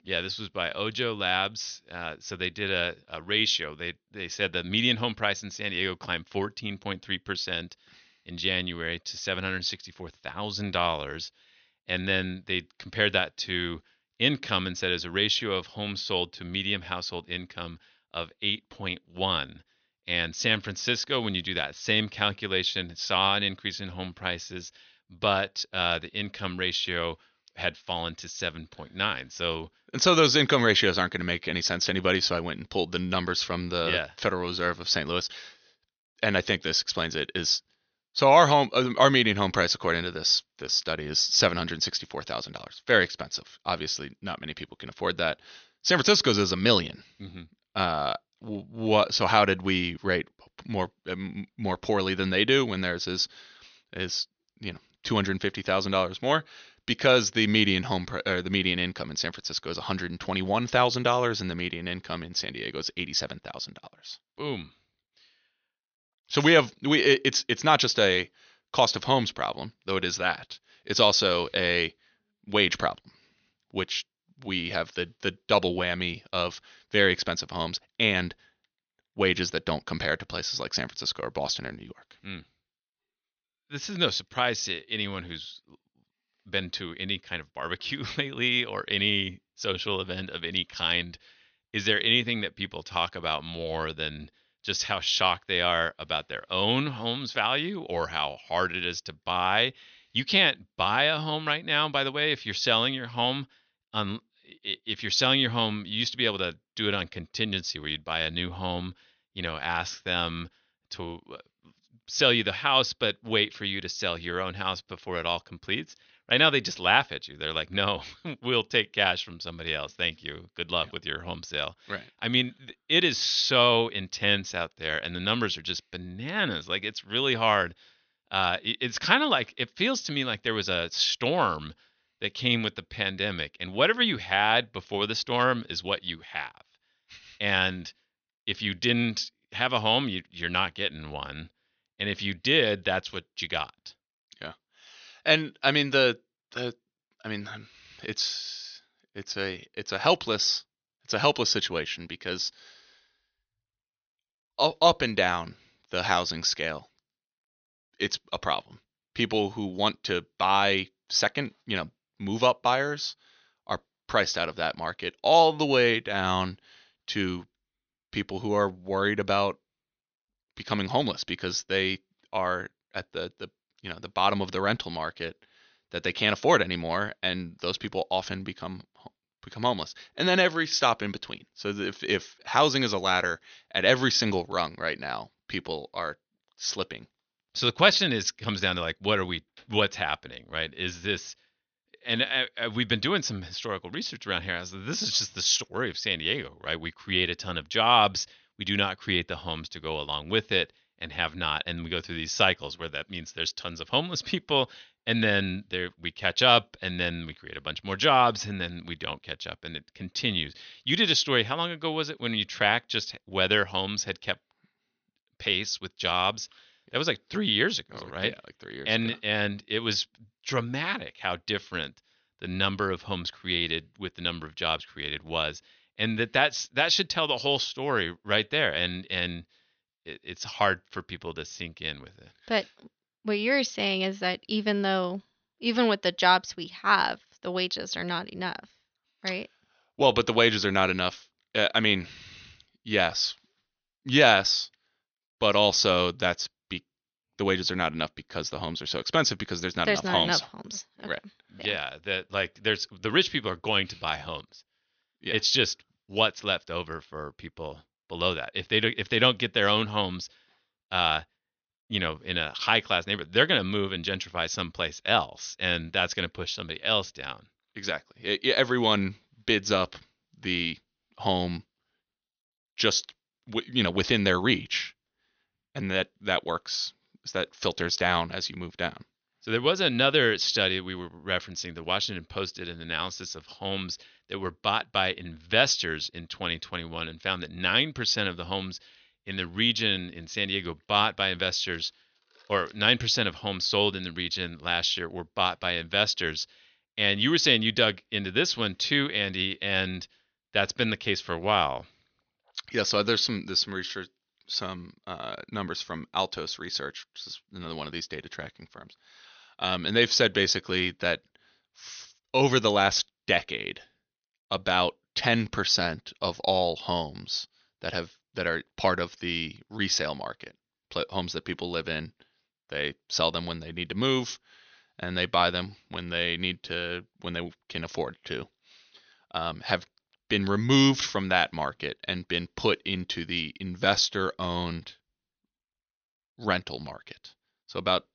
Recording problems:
thin; somewhat; fading below 750 Hz
high frequencies cut off; noticeable; nothing above 6.5 kHz

